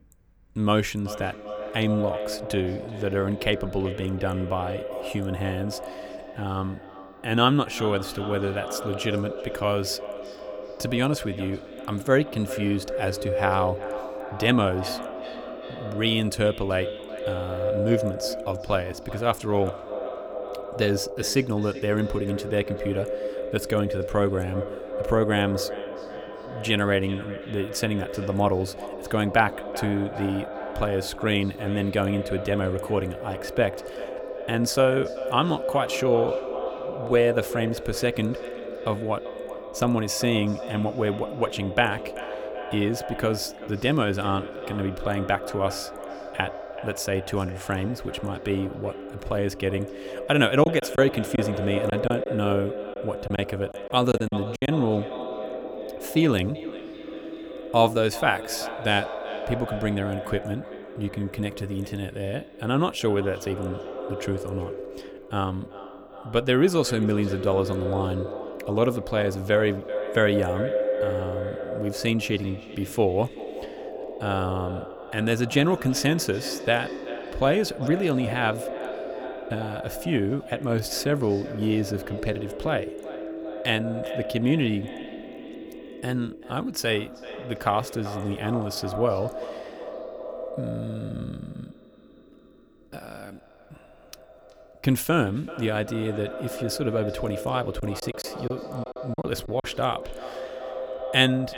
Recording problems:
echo of what is said; strong; throughout; 380 ms later, 8 dB below the speech
choppy; very; from 51 to 55 s and from 1:38 to 1:40; 11% of the speech affected

